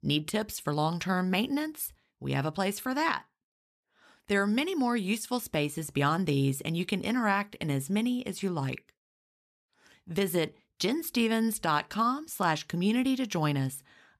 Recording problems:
none

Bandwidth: 14 kHz